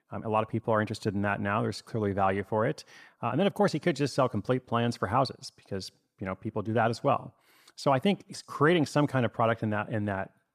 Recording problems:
none

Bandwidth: 14.5 kHz